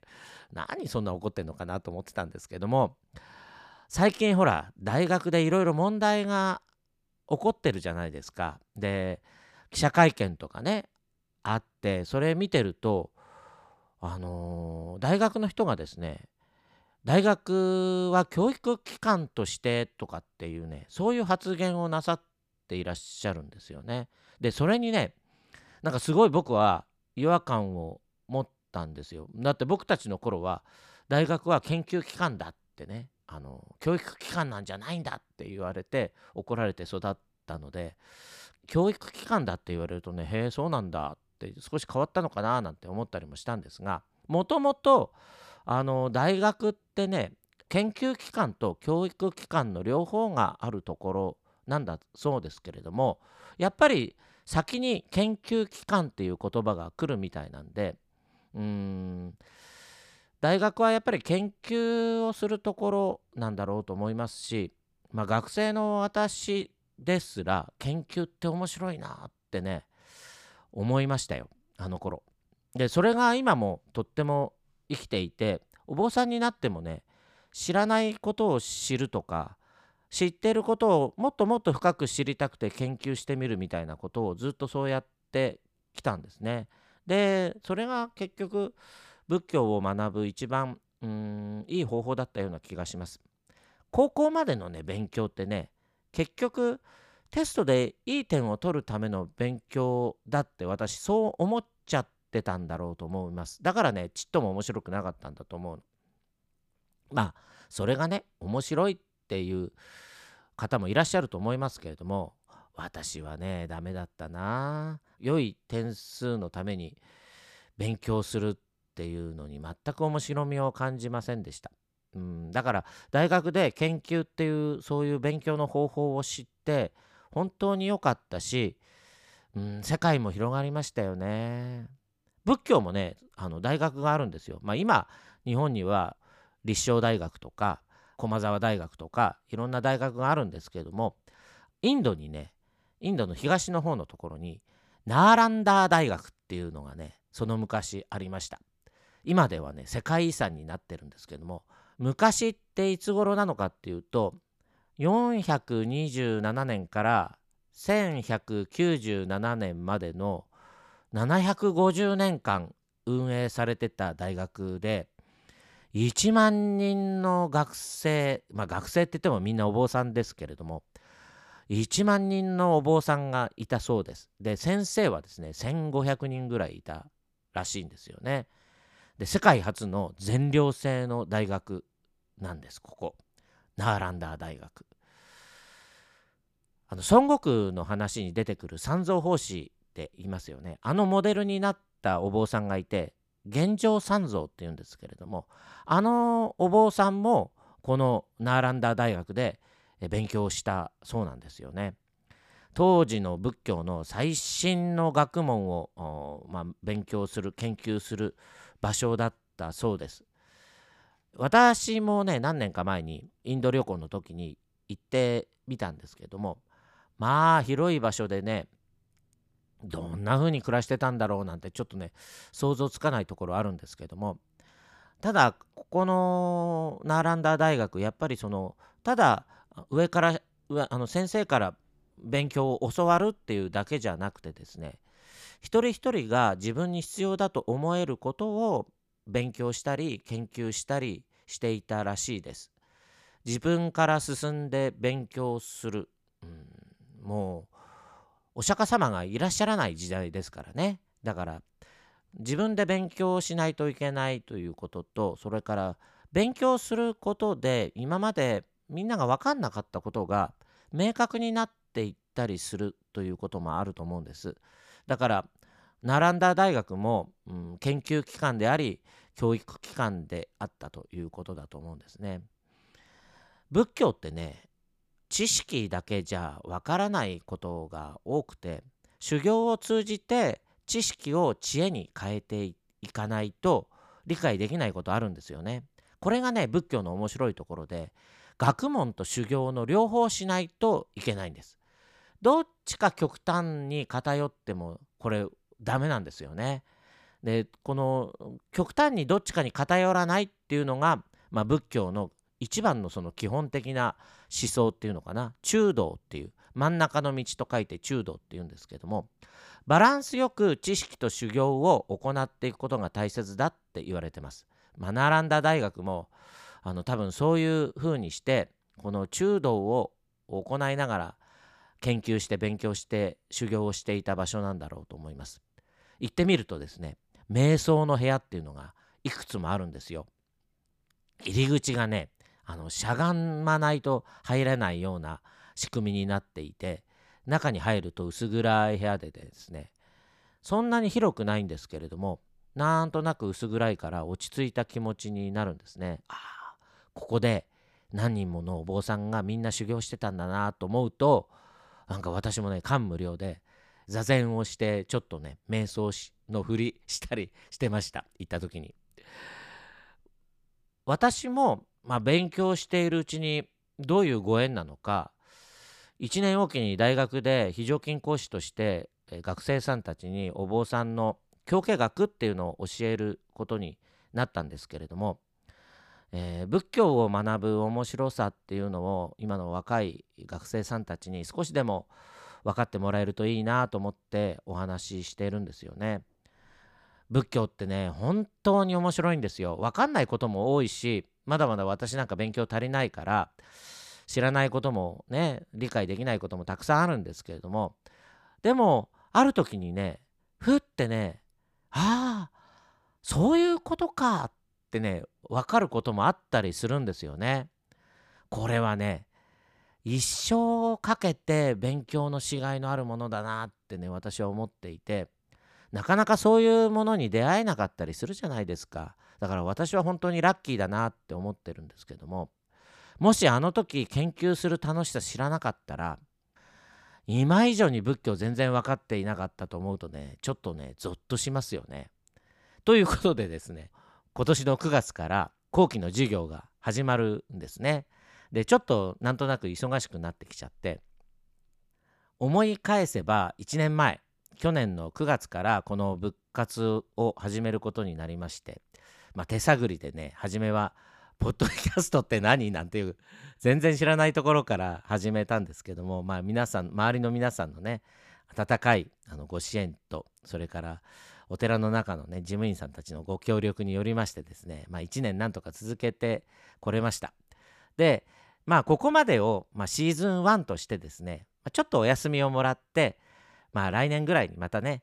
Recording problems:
none

